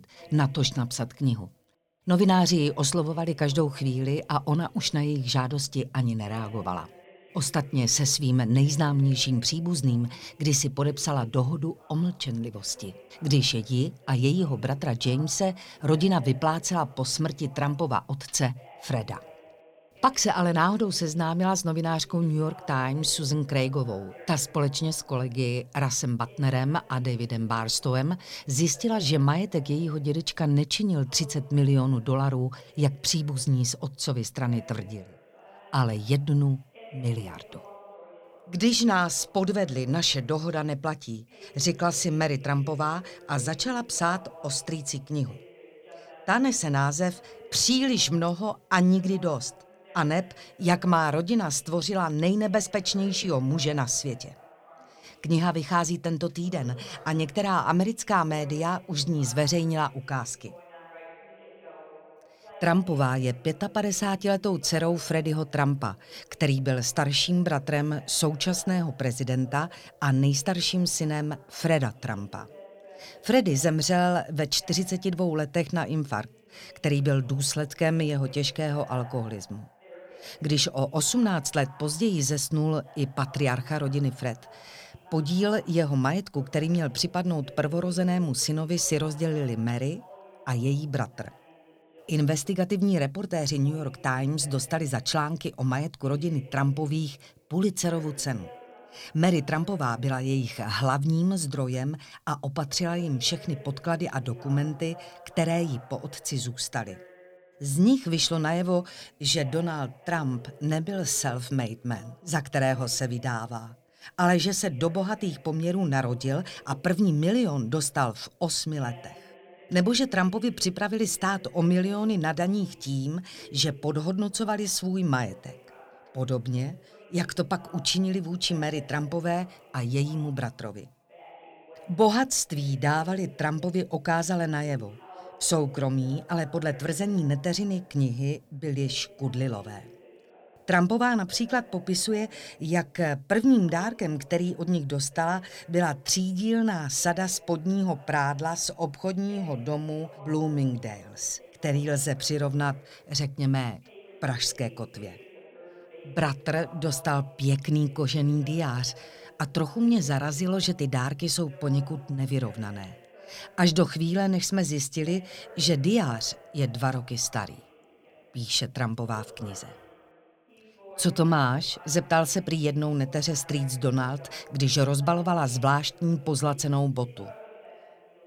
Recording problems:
voice in the background; faint; throughout; 25 dB below the speech

